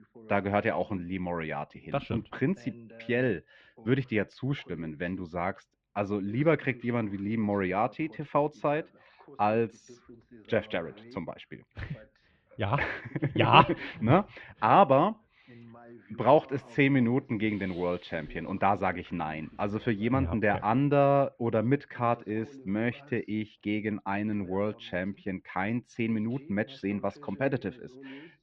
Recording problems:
muffled; very; fading above 2.5 kHz
voice in the background; faint; throughout; 25 dB below the speech

